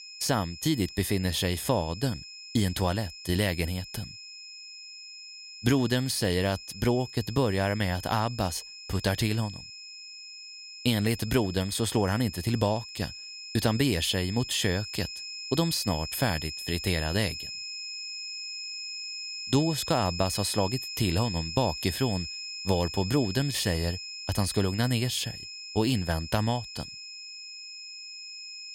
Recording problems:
high-pitched whine; loud; throughout; 5 kHz, 9 dB below the speech

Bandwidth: 16 kHz